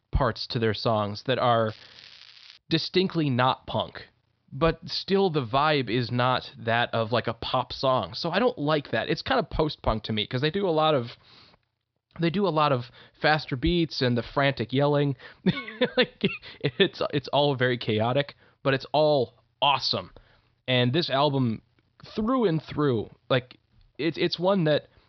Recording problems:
high frequencies cut off; noticeable; nothing above 5.5 kHz
crackling; faint; at 1.5 s, mostly in the pauses; 20 dB below the speech

